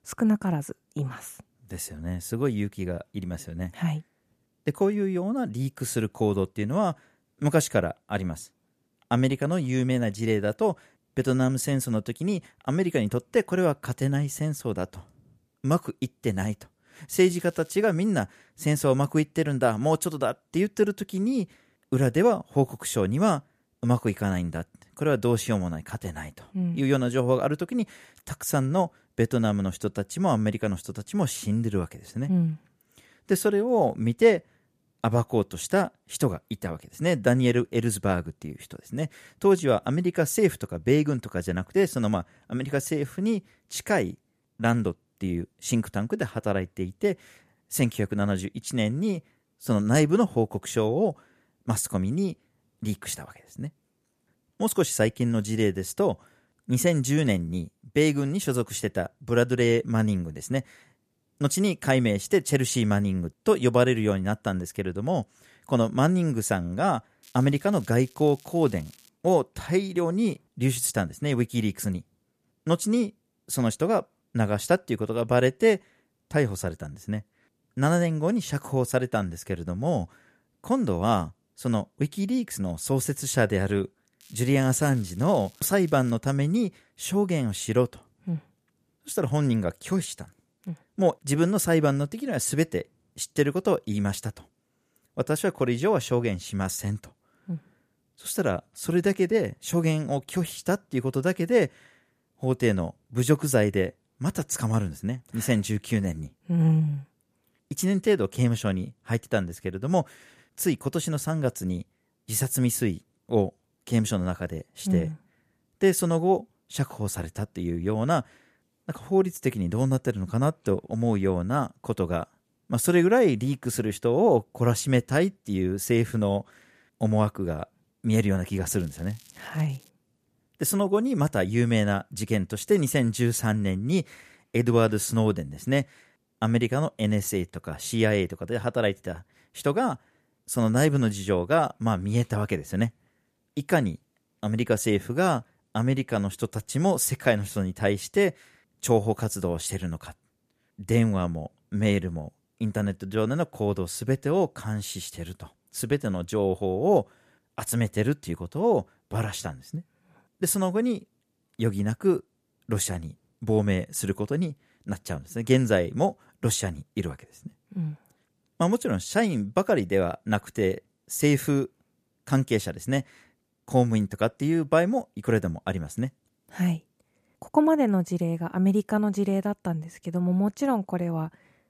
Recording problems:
crackling; faint; 4 times, first at 17 s; 25 dB below the speech

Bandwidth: 14.5 kHz